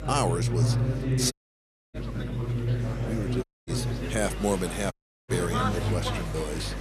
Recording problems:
chatter from many people; very loud; throughout; 1 dB above the speech
electrical hum; noticeable; throughout; 50 Hz, 15 dB below the speech
audio cutting out; at 1.5 s for 0.5 s, at 3.5 s and at 5 s

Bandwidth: 13.5 kHz